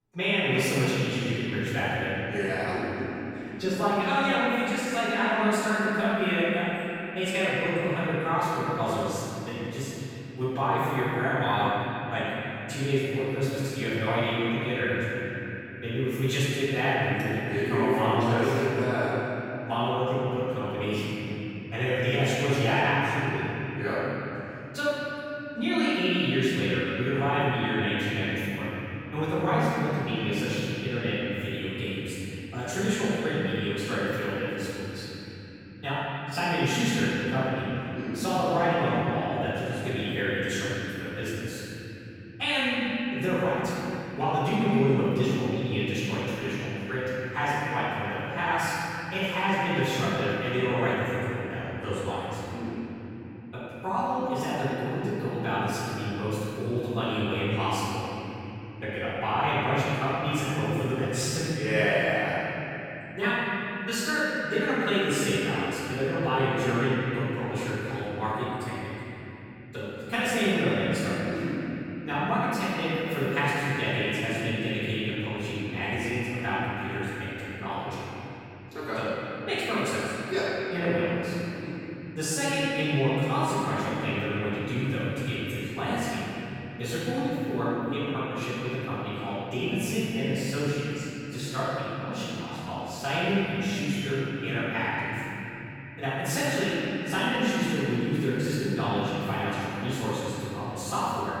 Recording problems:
room echo; strong; dies away in 3 s
off-mic speech; far

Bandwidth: 17.5 kHz